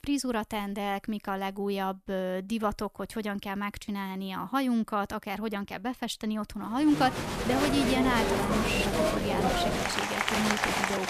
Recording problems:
crowd noise; very loud; from 7 s on; 2 dB above the speech

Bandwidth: 14.5 kHz